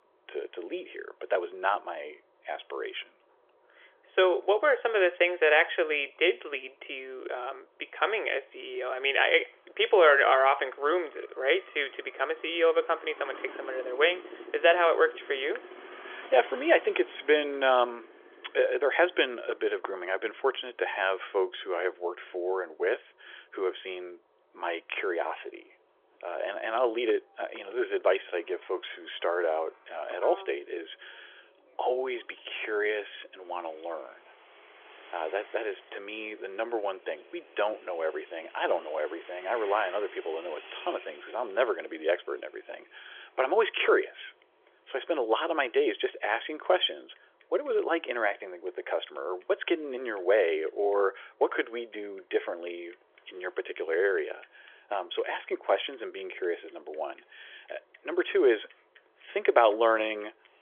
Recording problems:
phone-call audio; nothing above 3.5 kHz
traffic noise; faint; throughout; 20 dB below the speech

